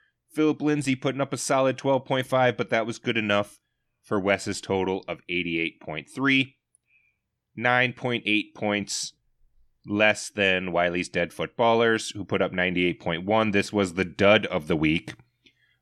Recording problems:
none

